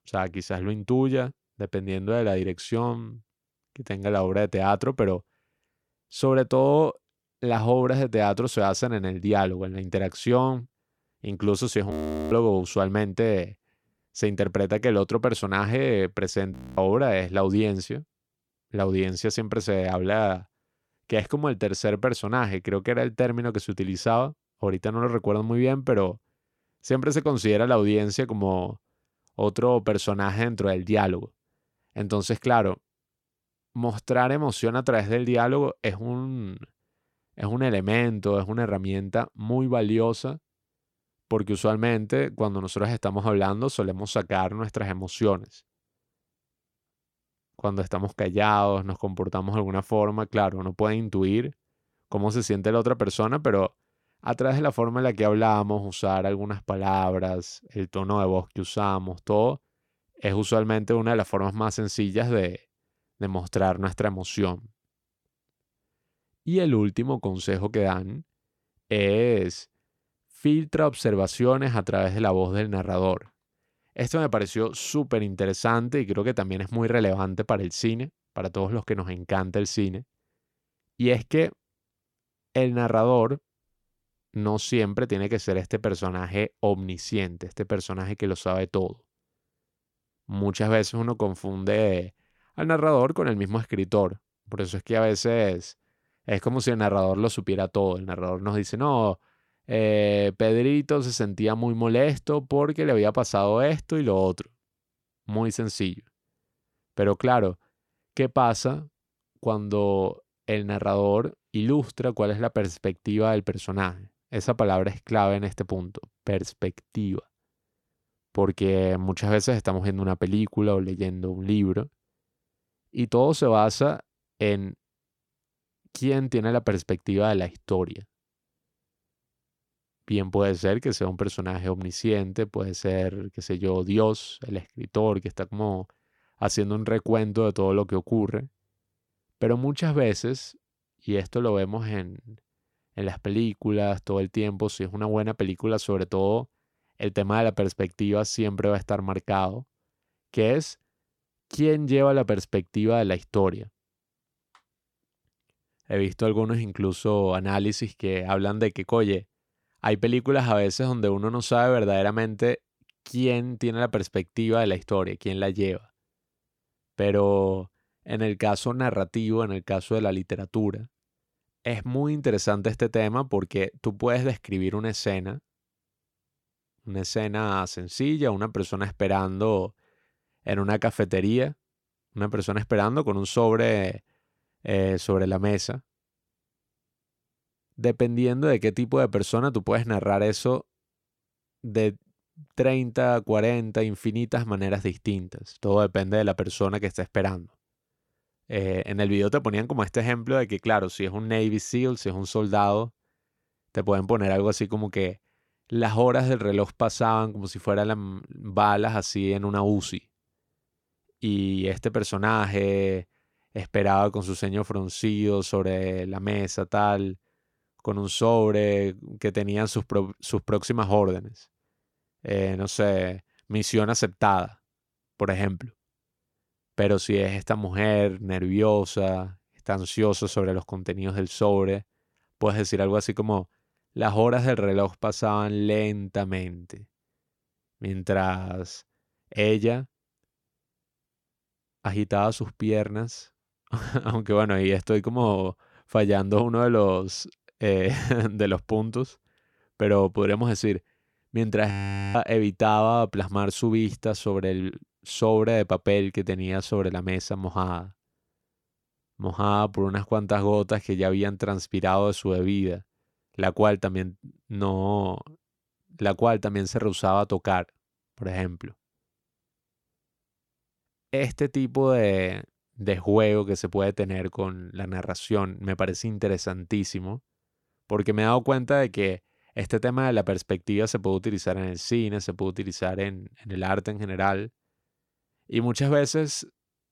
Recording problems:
audio freezing; at 12 s, at 17 s and at 4:12

